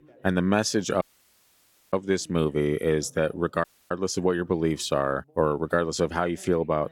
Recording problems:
background chatter; faint; throughout; 2 voices, 30 dB below the speech
audio cutting out; at 1 s for 1 s and at 3.5 s

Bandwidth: 17.5 kHz